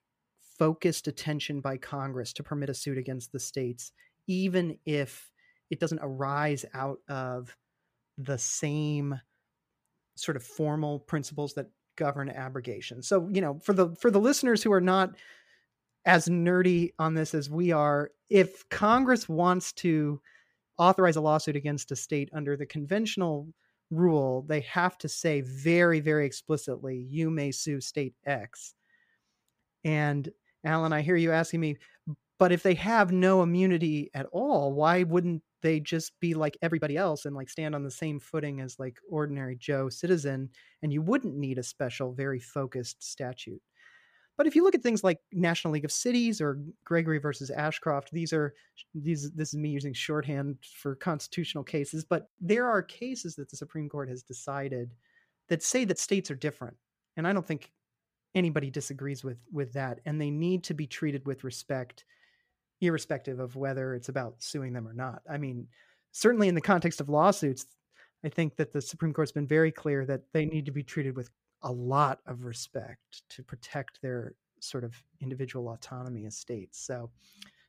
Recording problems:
uneven, jittery; strongly; from 2.5 s to 1:13

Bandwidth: 15 kHz